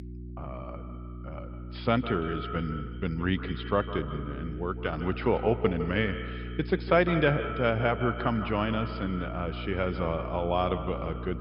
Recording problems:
echo of what is said; strong; throughout; 150 ms later, 9 dB below the speech
high frequencies cut off; noticeable; nothing above 5.5 kHz
electrical hum; noticeable; throughout; 60 Hz, 20 dB below the speech

